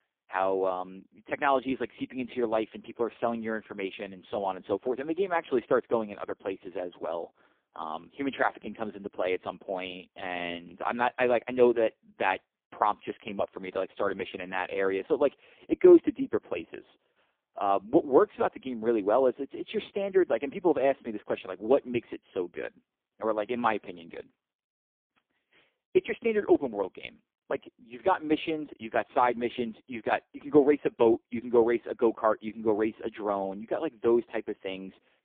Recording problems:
phone-call audio; poor line

